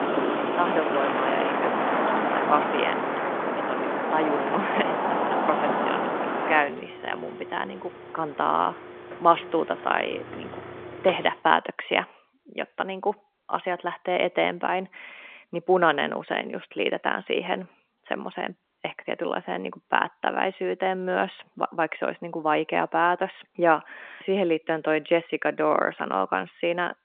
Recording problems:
phone-call audio; nothing above 3 kHz
traffic noise; very loud; until 11 s; 1 dB above the speech

